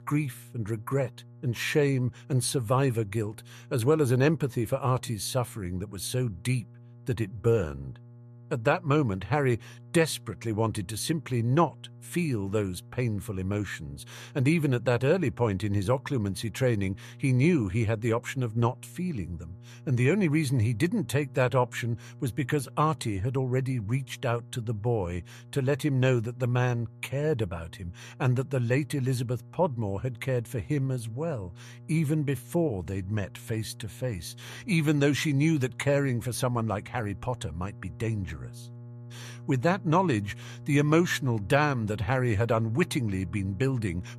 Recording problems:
electrical hum; faint; throughout; 60 Hz, 25 dB below the speech

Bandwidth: 14 kHz